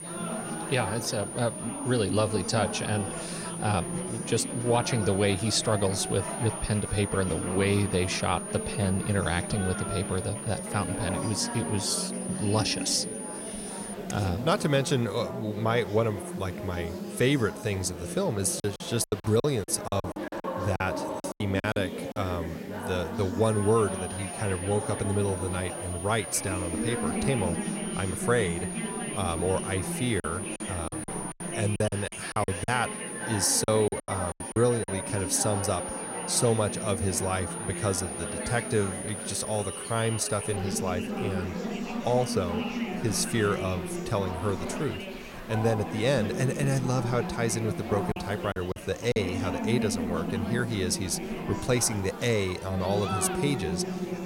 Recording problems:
high-pitched whine; loud; until 14 s and from 23 to 41 s; 9.5 kHz, 8 dB below the speech
chatter from many people; loud; throughout; 6 dB below the speech
hiss; faint; throughout; 30 dB below the speech
choppy; very; from 19 to 22 s, from 30 to 35 s and from 48 to 49 s; 17% of the speech affected

